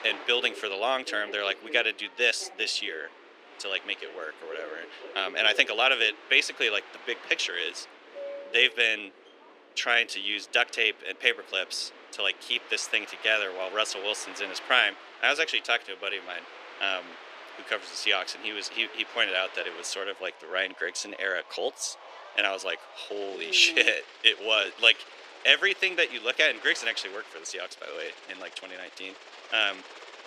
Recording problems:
thin; very; fading below 350 Hz
train or aircraft noise; noticeable; throughout; 20 dB below the speech

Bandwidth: 14.5 kHz